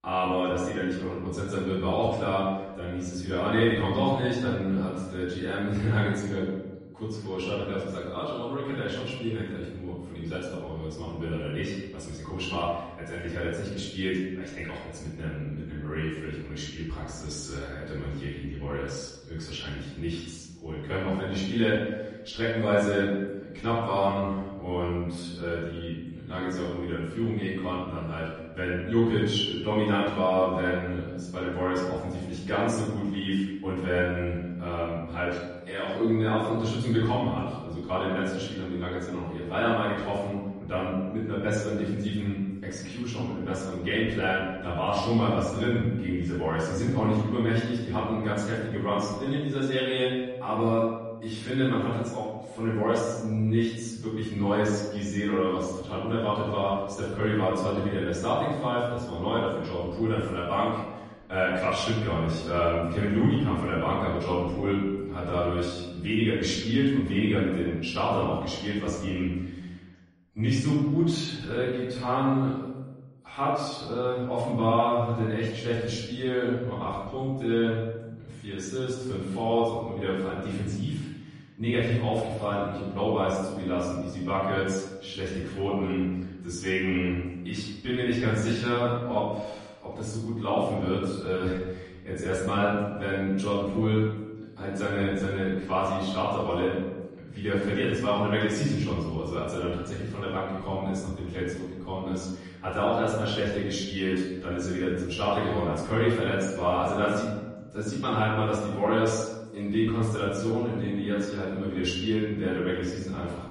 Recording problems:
off-mic speech; far
room echo; noticeable; dies away in 1 s
garbled, watery; slightly; nothing above 10.5 kHz

